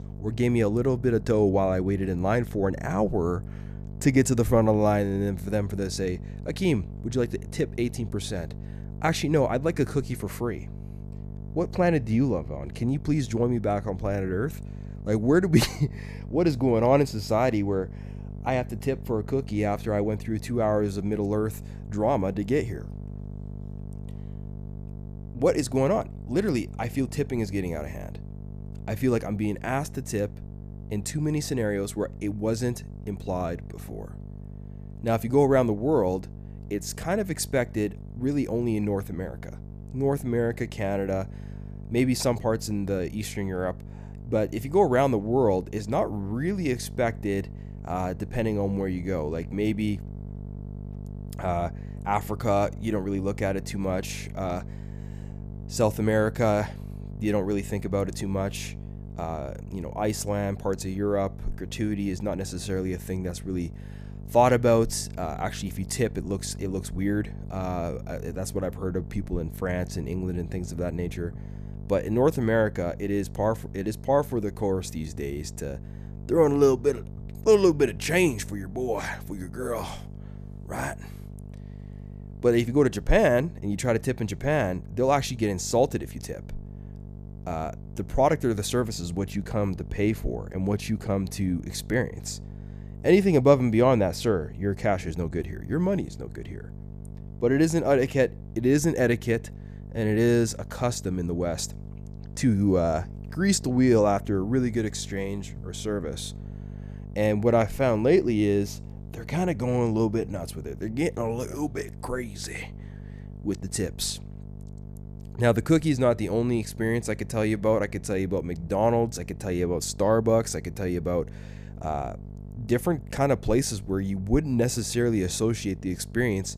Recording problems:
electrical hum; faint; throughout; 50 Hz, 20 dB below the speech

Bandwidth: 14.5 kHz